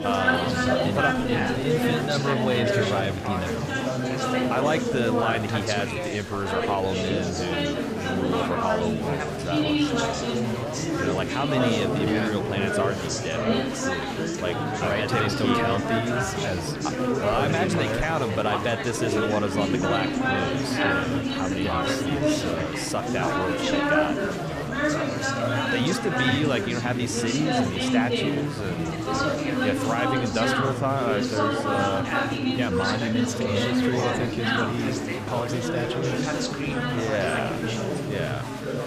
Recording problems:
chatter from many people; very loud; throughout; 3 dB above the speech

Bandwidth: 15 kHz